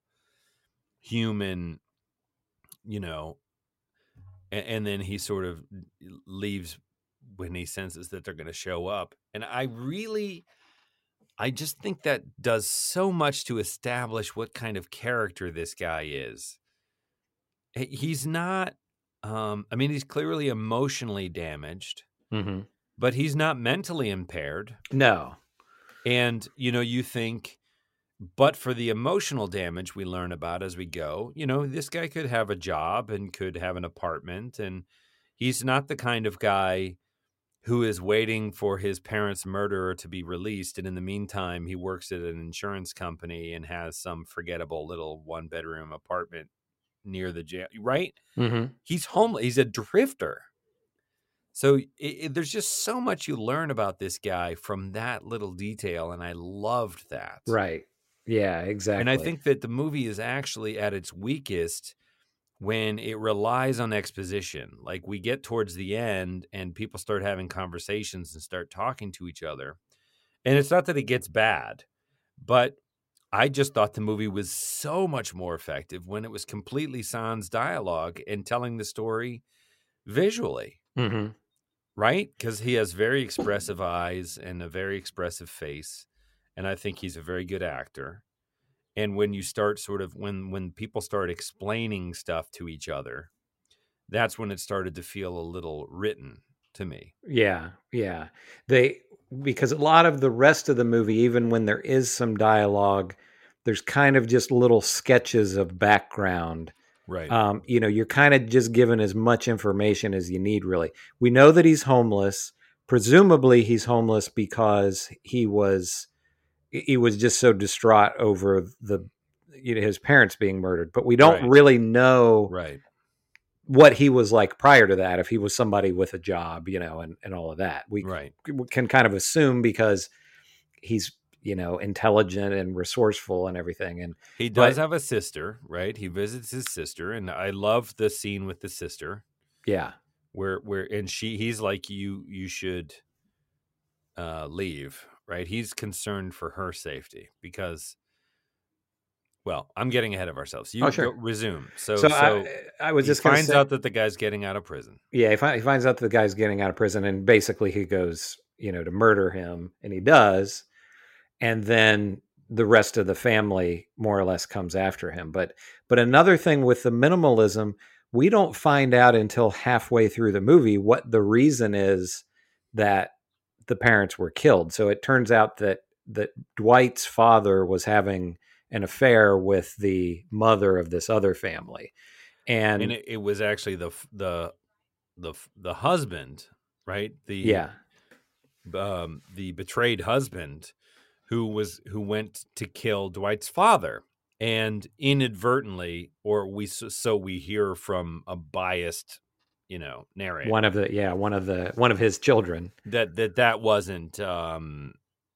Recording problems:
none

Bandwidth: 16 kHz